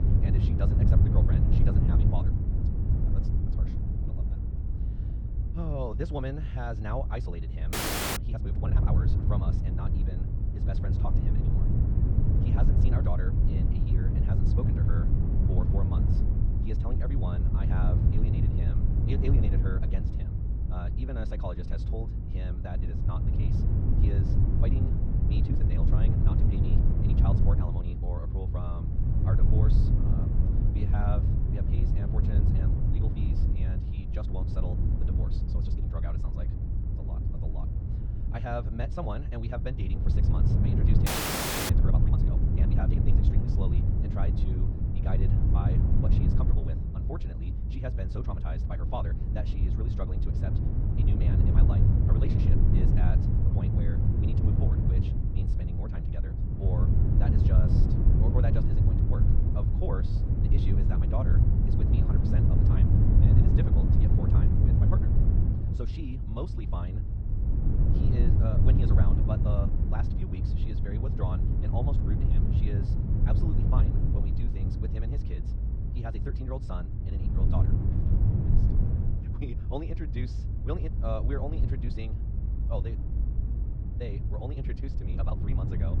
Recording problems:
wrong speed, natural pitch; too fast; 1.7 times normal speed
muffled; slightly; fading above 2.5 kHz
low rumble; very loud; throughout; 2 dB above the speech
audio freezing; at 7.5 s and at 41 s for 0.5 s

